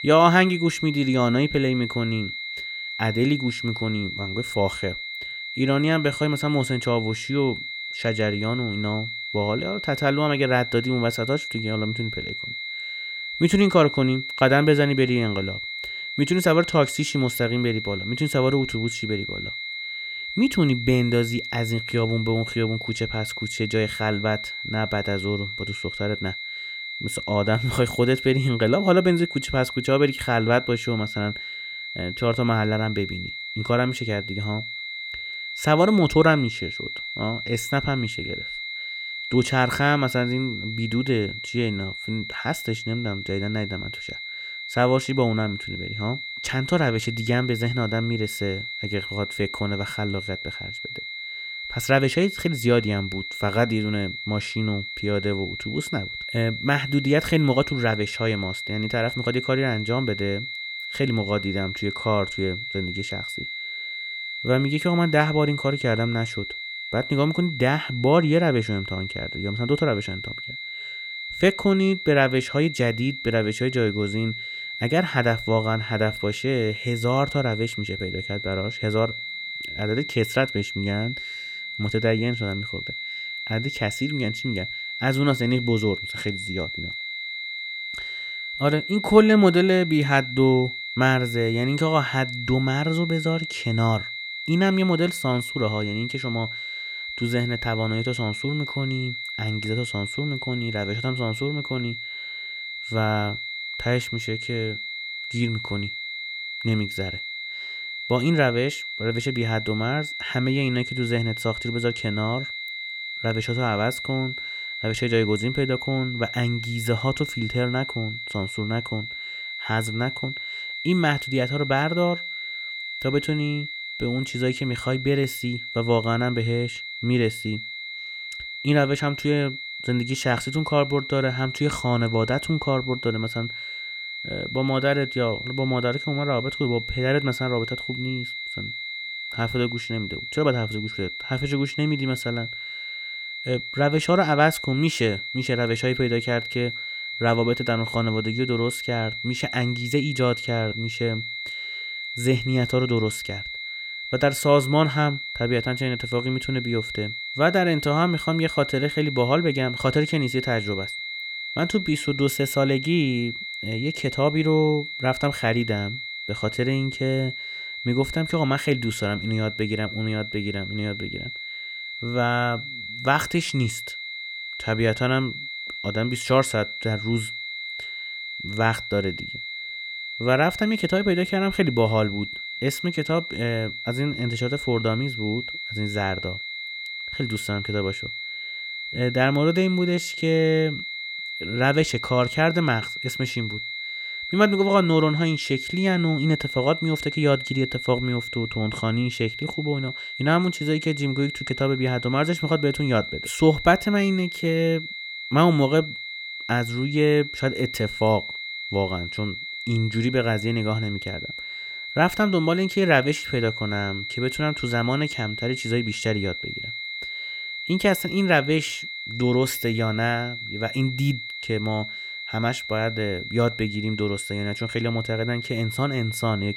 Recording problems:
high-pitched whine; loud; throughout; 2 kHz, 6 dB below the speech

